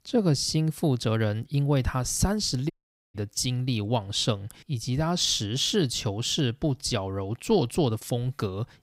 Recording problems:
audio cutting out; at 2.5 s

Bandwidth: 15.5 kHz